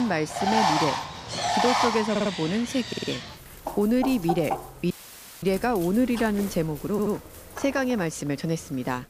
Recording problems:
animal sounds; loud; throughout; 2 dB below the speech
abrupt cut into speech; at the start
audio stuttering; at 2 s, at 3 s and at 7 s
audio cutting out; filled with static; at 5 s for 0.5 s

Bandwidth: 15 kHz